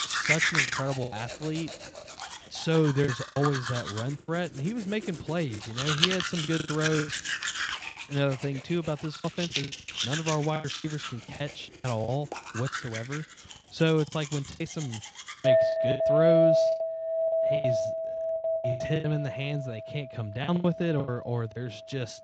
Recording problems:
garbled, watery; slightly; nothing above 7.5 kHz
household noises; very loud; throughout; 2 dB above the speech
choppy; very; 11% of the speech affected

